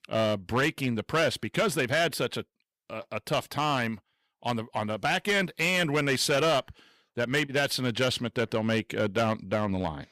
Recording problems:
distortion; slight; 7% of the sound clipped

